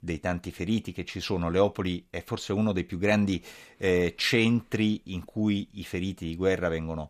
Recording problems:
none

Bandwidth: 14.5 kHz